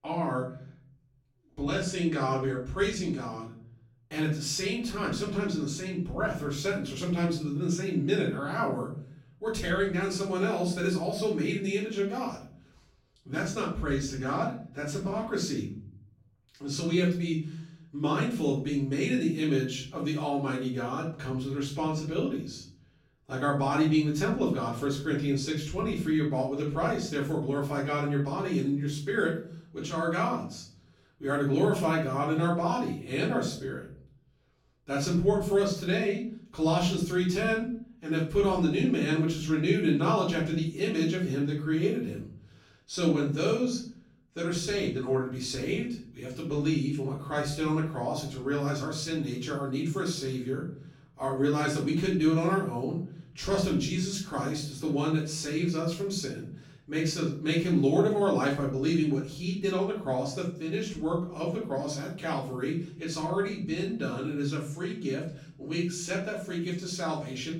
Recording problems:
off-mic speech; far
room echo; noticeable; dies away in 0.7 s

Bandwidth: 17 kHz